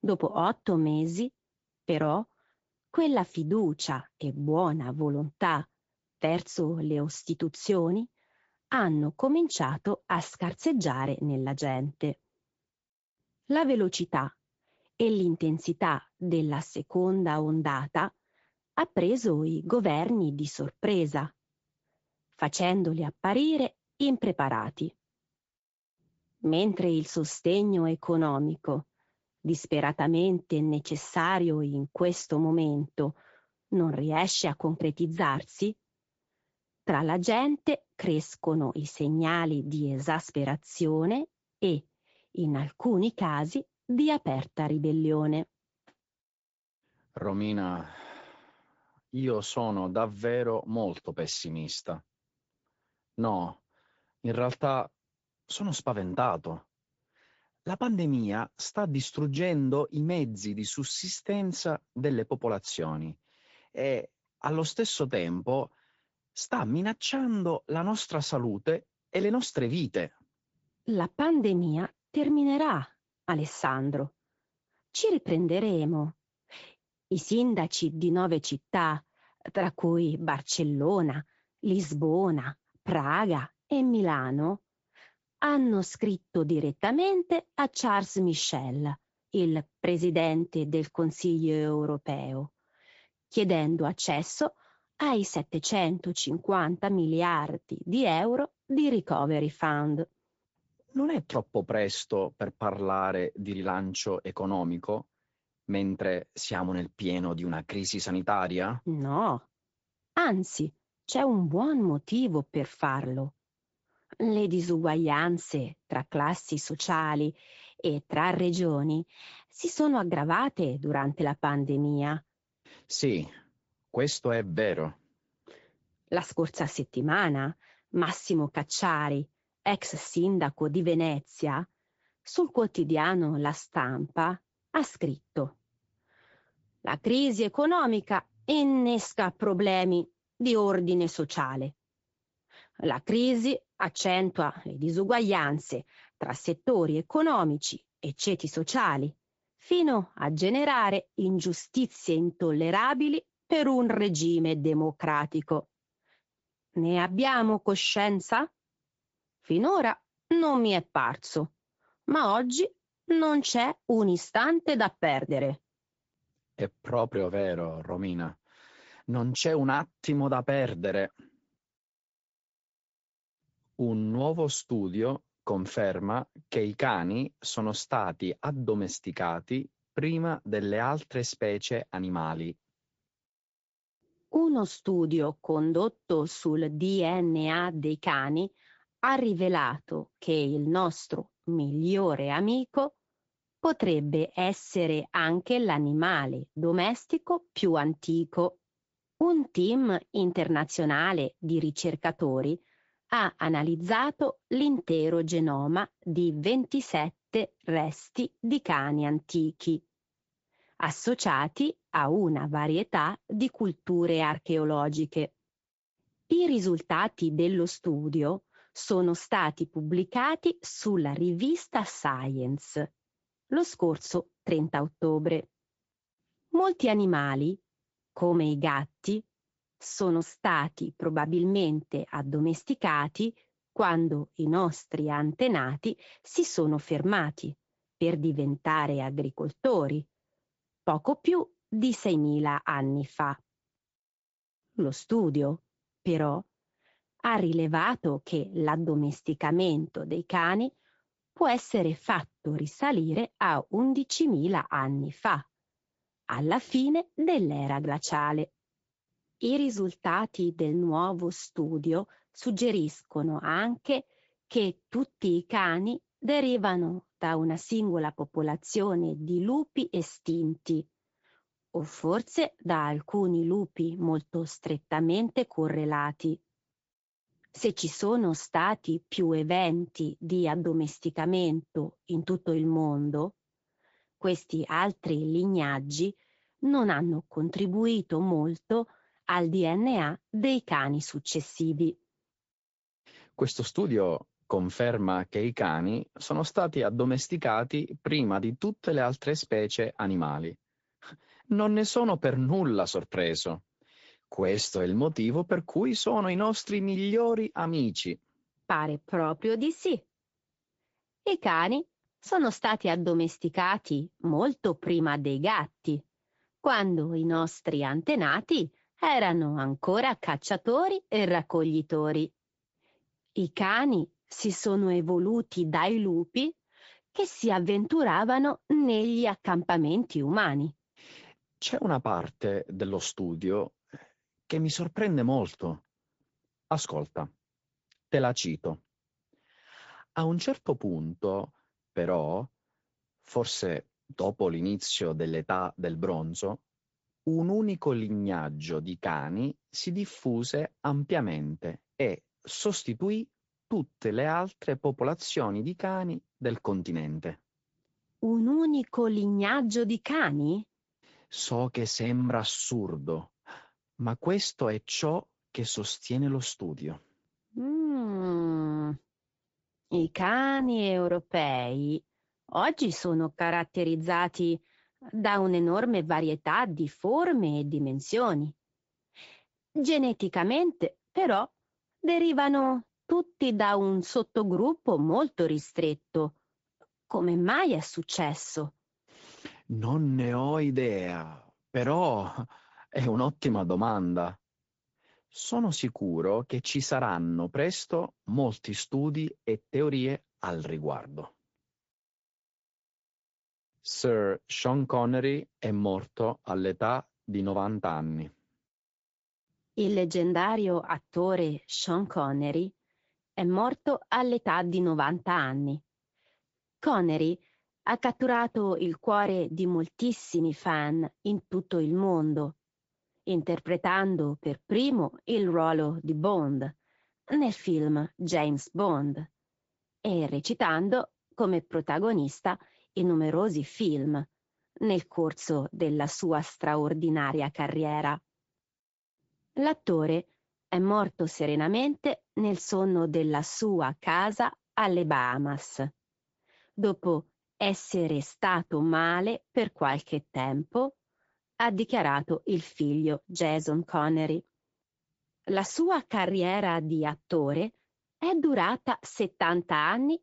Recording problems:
high frequencies cut off; noticeable; nothing above 7.5 kHz
garbled, watery; slightly

